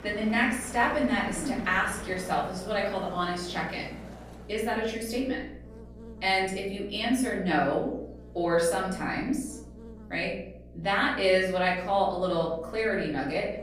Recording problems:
off-mic speech; far
room echo; noticeable; dies away in 0.6 s
traffic noise; noticeable; until 4.5 s; 15 dB below the speech
electrical hum; faint; throughout; 60 Hz, 25 dB below the speech

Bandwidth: 15 kHz